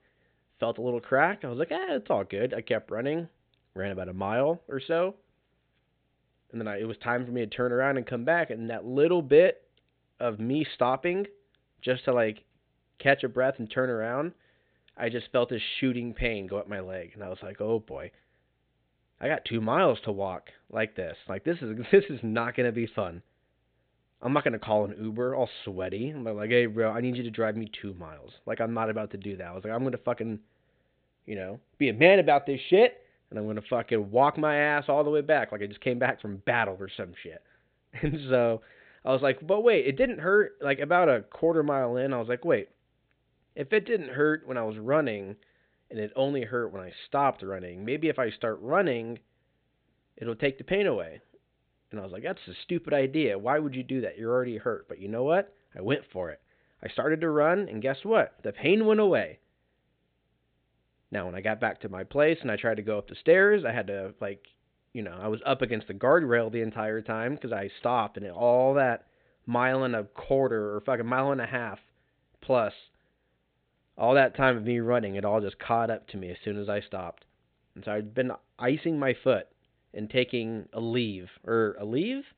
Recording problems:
high frequencies cut off; severe; nothing above 4 kHz

